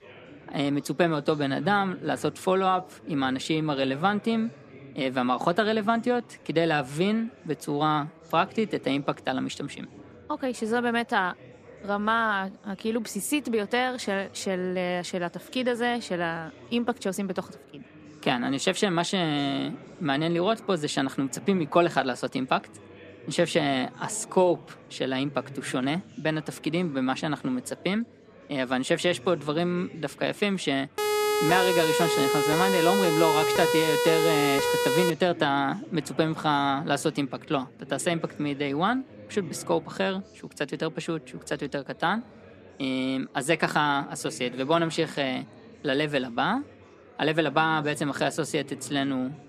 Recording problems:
chatter from many people; faint; throughout; 20 dB below the speech
siren; loud; from 31 to 35 s; peak 3 dB above the speech

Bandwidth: 14.5 kHz